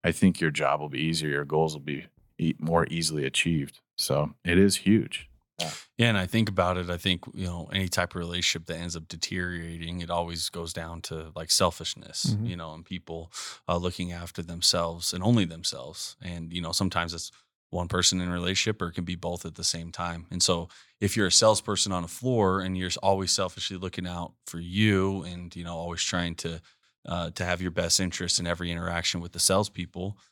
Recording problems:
none

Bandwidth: 18 kHz